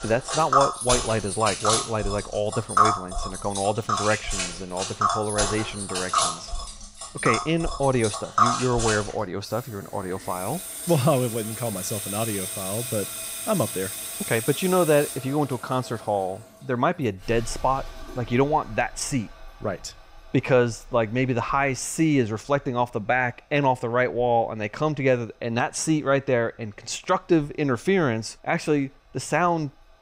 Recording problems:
household noises; loud; throughout; 2 dB below the speech

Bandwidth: 15.5 kHz